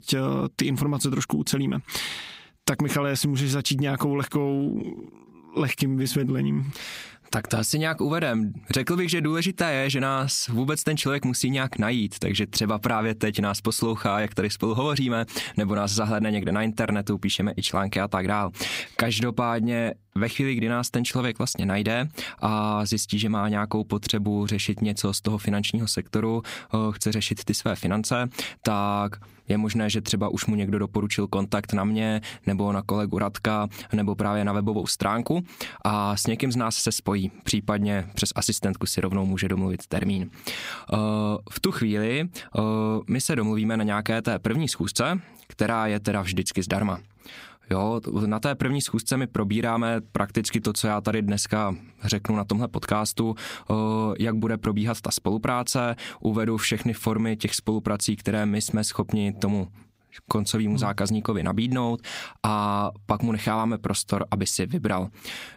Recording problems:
squashed, flat; somewhat

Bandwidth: 15.5 kHz